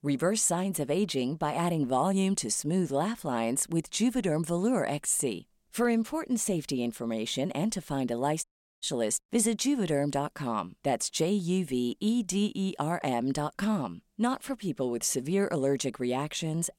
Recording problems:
audio cutting out; at 8.5 s

